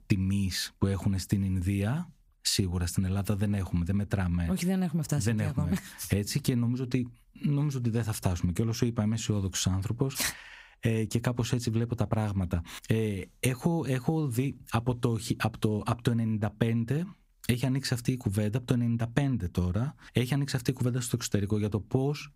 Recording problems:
squashed, flat; somewhat

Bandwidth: 15.5 kHz